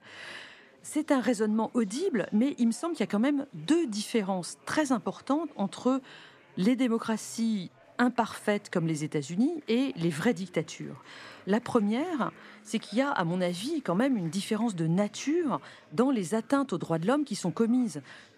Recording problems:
chatter from many people; faint; throughout; 25 dB below the speech

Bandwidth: 14.5 kHz